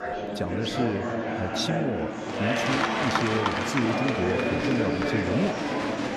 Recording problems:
murmuring crowd; very loud; throughout; 3 dB above the speech

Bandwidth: 13.5 kHz